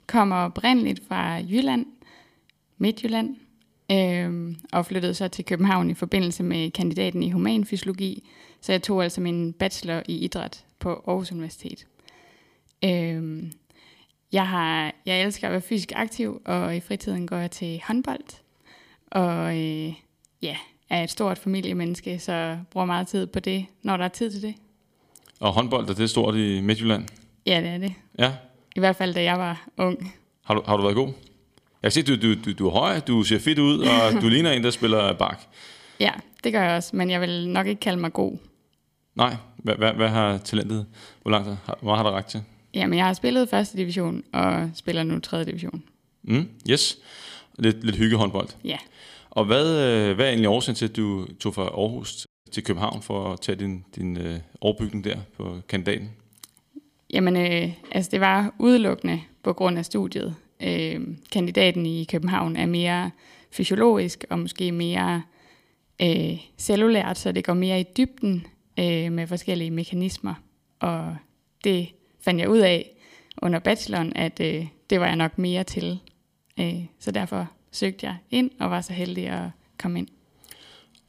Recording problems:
audio cutting out; at 52 s

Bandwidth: 15 kHz